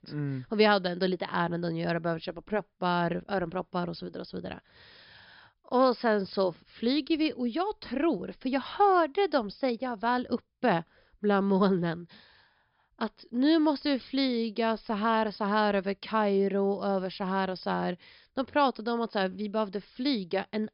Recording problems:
high frequencies cut off; noticeable; nothing above 5.5 kHz

